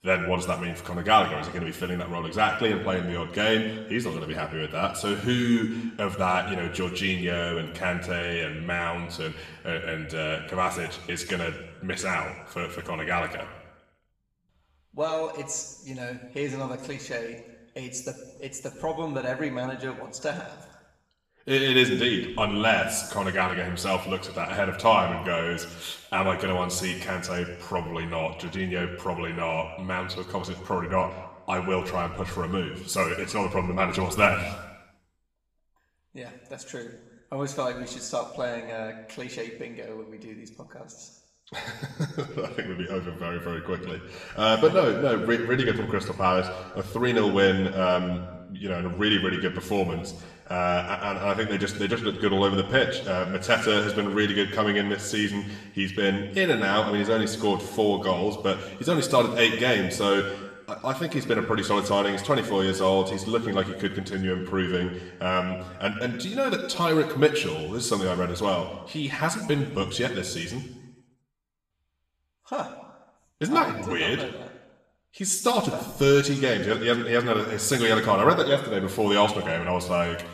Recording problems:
room echo; slight; dies away in 1 s
off-mic speech; somewhat distant

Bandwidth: 14.5 kHz